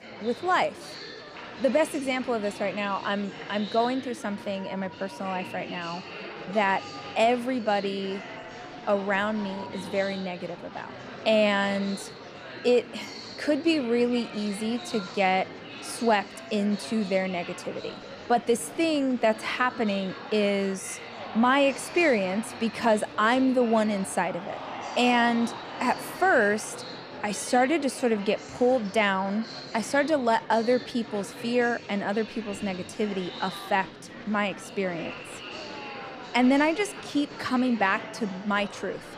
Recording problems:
murmuring crowd; noticeable; throughout; 15 dB below the speech

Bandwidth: 14.5 kHz